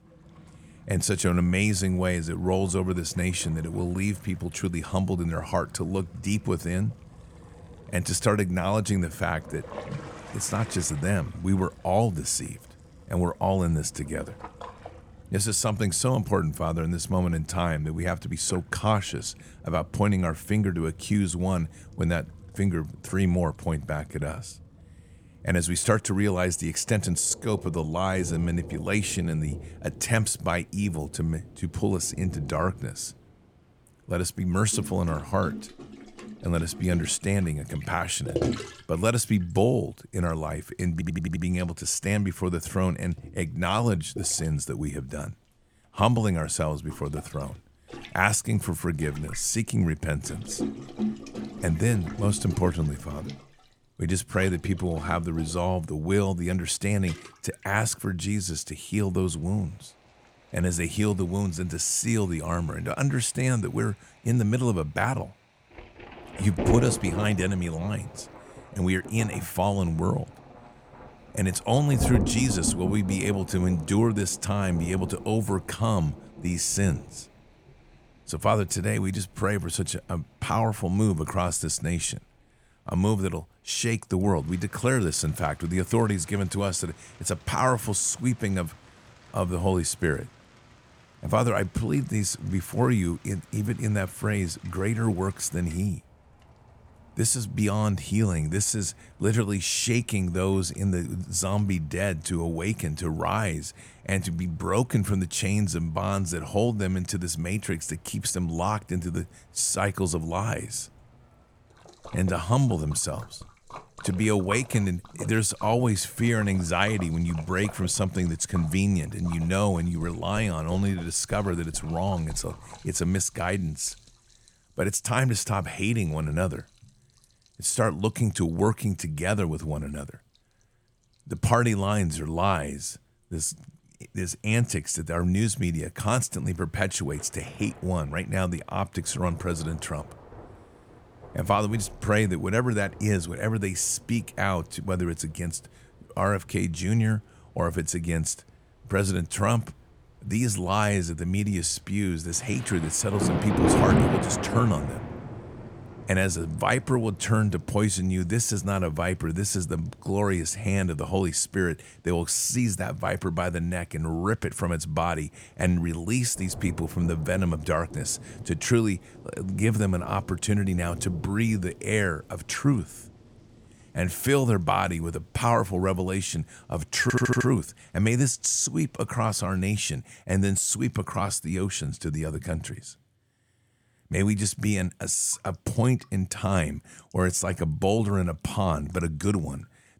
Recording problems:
rain or running water; noticeable; throughout; 10 dB below the speech
audio stuttering; at 41 s and at 2:57

